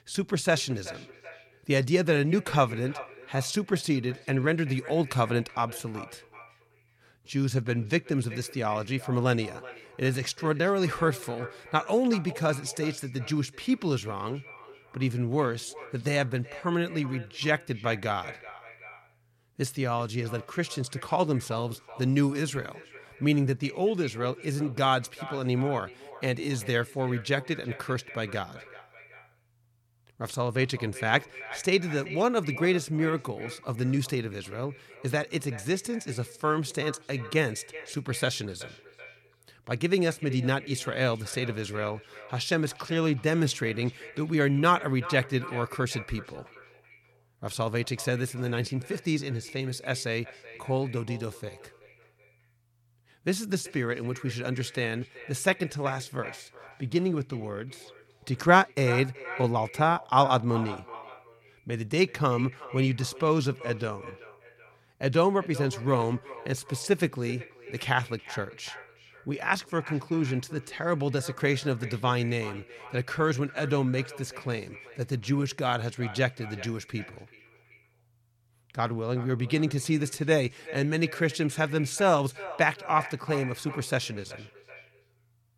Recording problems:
echo of what is said; noticeable; throughout; 380 ms later, 15 dB below the speech

